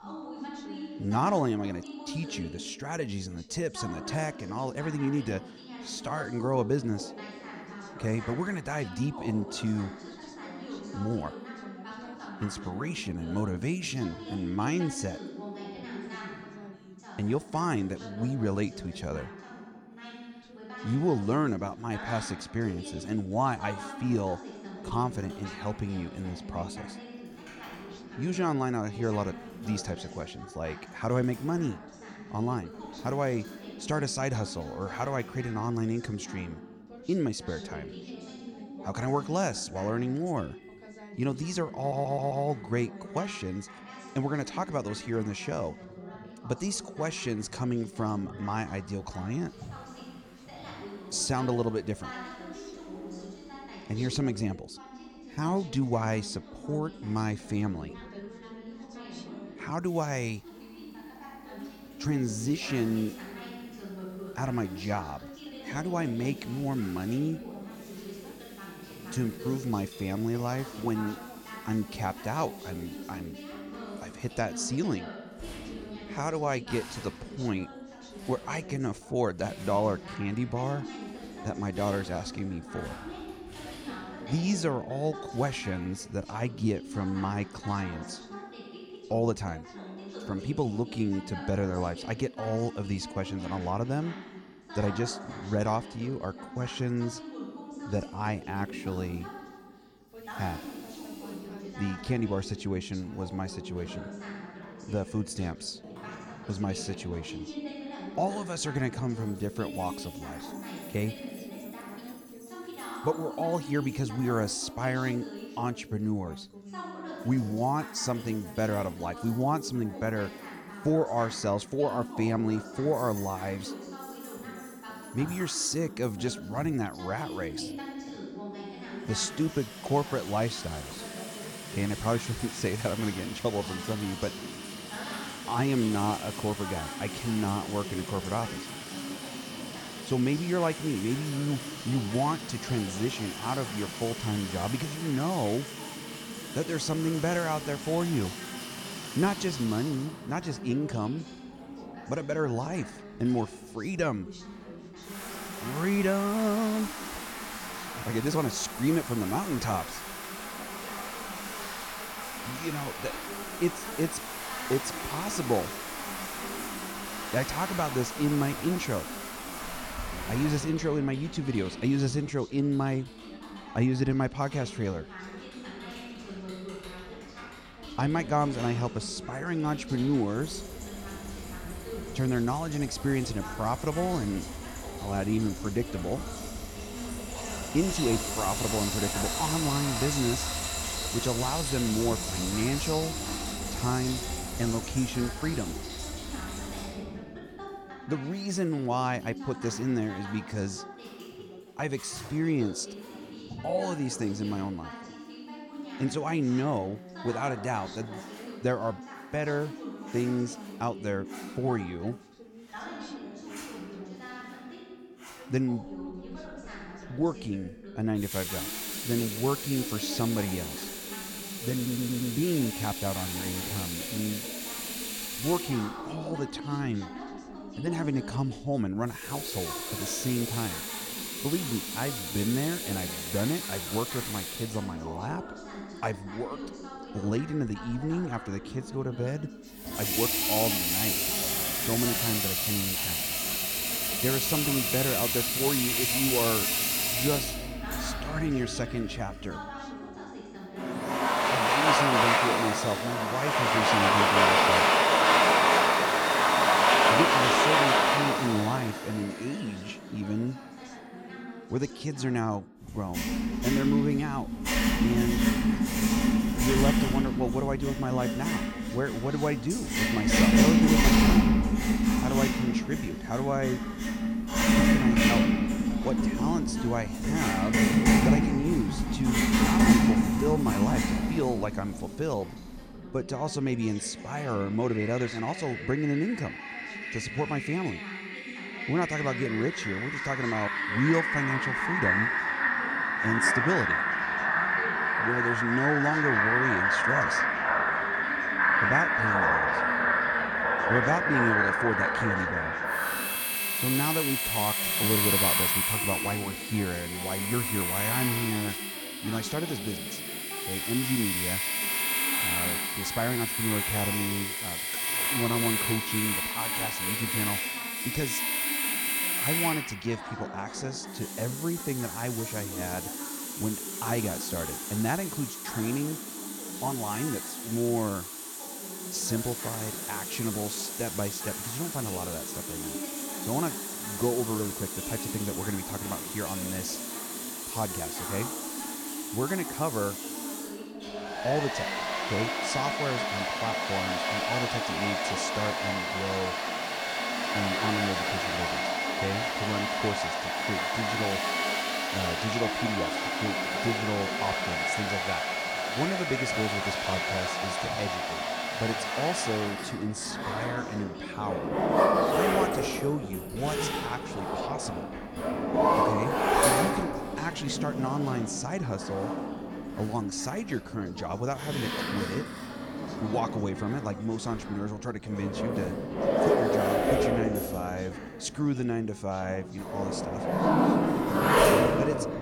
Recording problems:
household noises; very loud; throughout; 3 dB above the speech
background chatter; noticeable; throughout; 2 voices, 10 dB below the speech
audio stuttering; at 42 s and at 3:42

